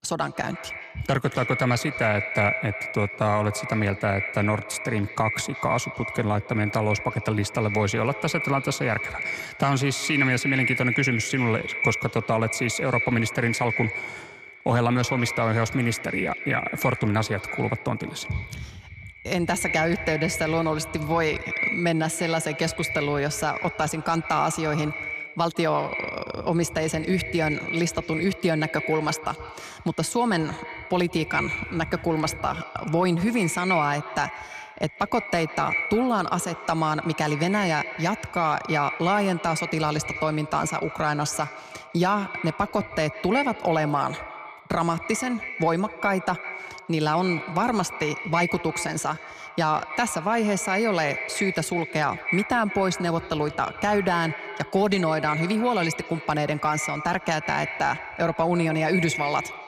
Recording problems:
echo of what is said; strong; throughout; 150 ms later, 6 dB below the speech

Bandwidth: 14.5 kHz